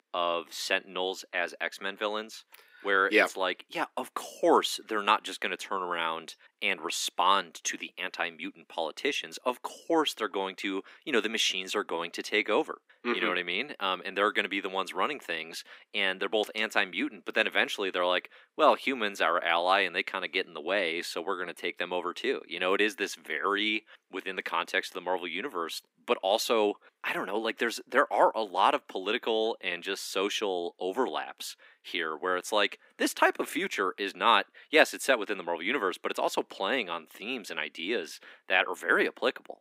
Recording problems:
thin; very; fading below 250 Hz

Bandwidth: 15.5 kHz